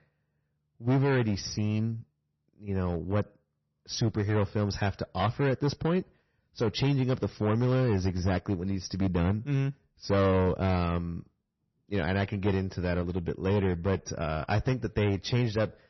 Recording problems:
distortion; slight; 8% of the sound clipped
garbled, watery; slightly; nothing above 6 kHz

